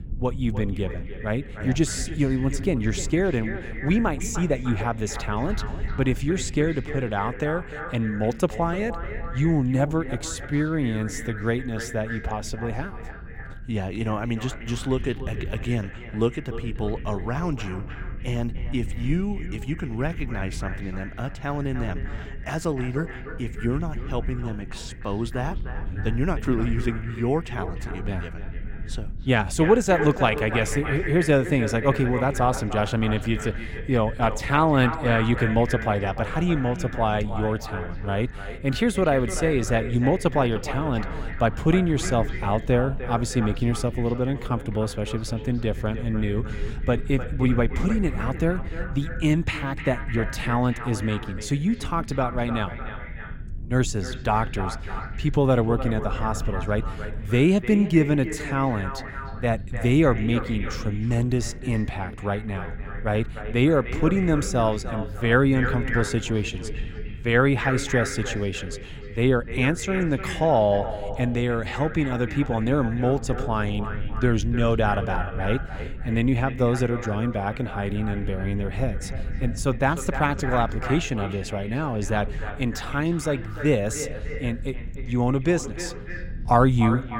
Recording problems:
echo of what is said; strong; throughout; 300 ms later, 10 dB below the speech
low rumble; faint; throughout; 25 dB below the speech

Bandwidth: 16 kHz